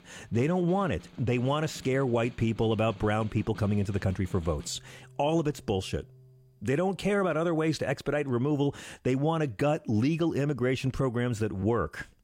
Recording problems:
background music; faint; until 6.5 s; 20 dB below the speech

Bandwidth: 16 kHz